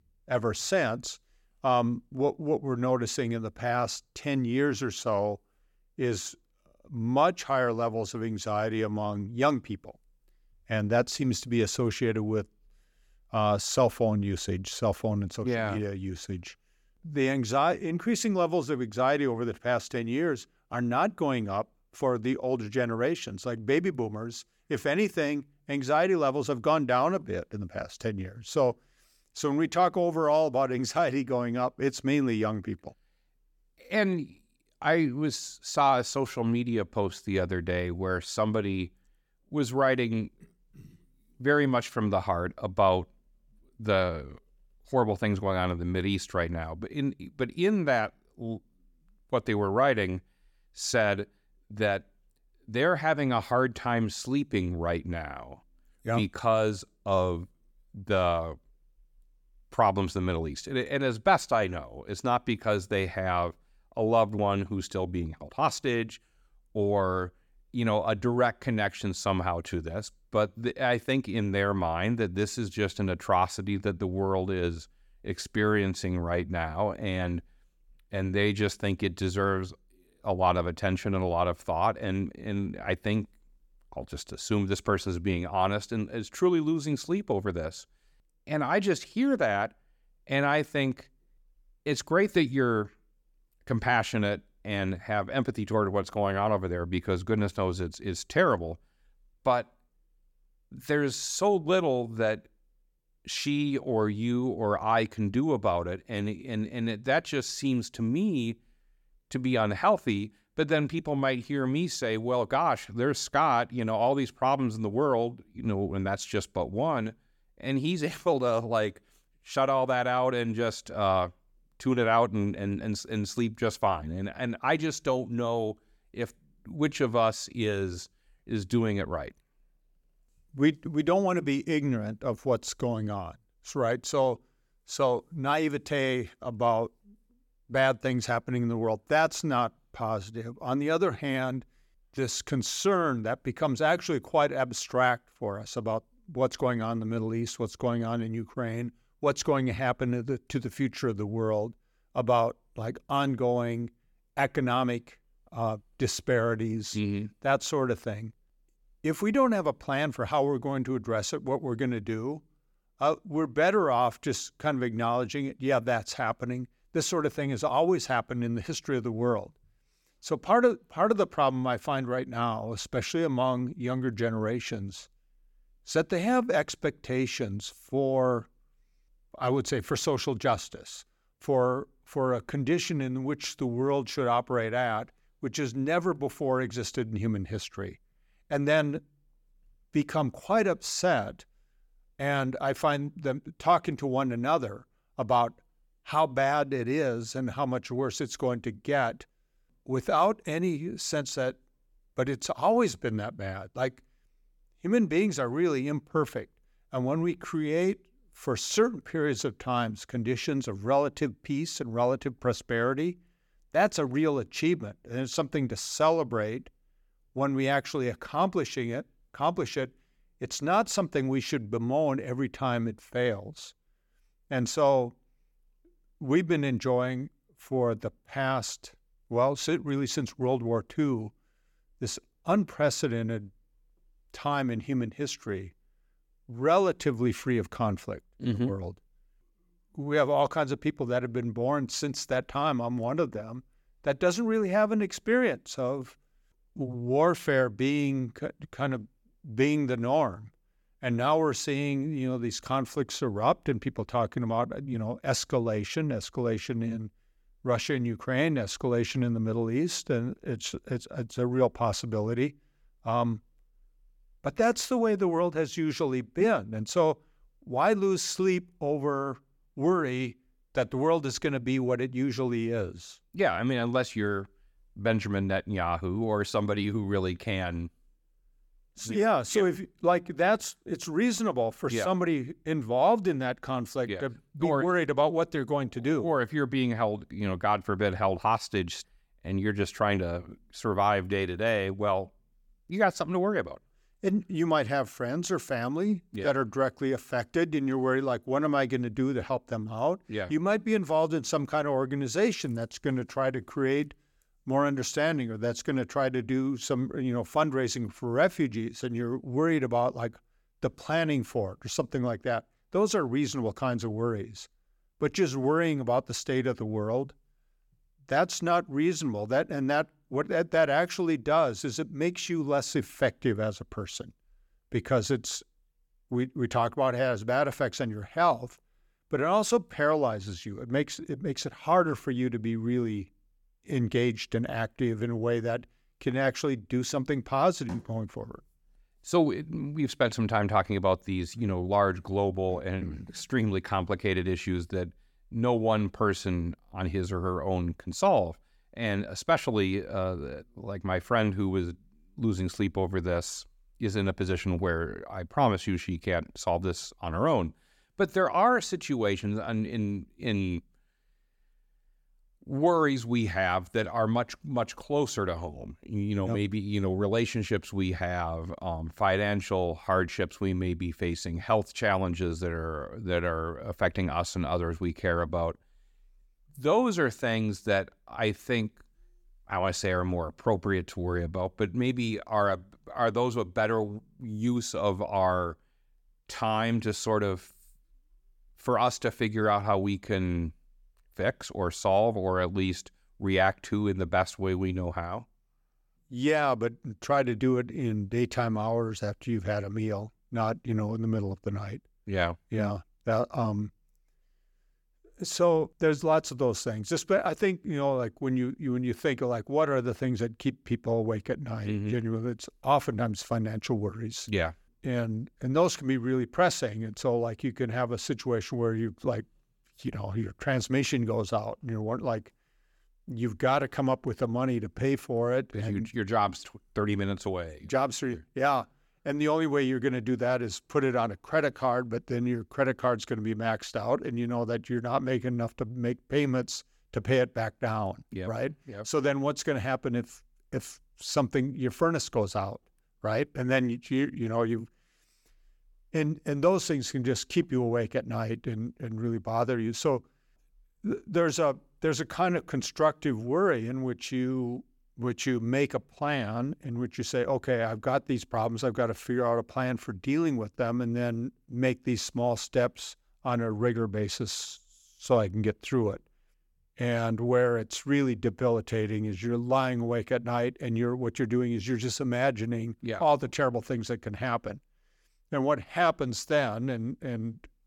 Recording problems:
none

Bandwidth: 17 kHz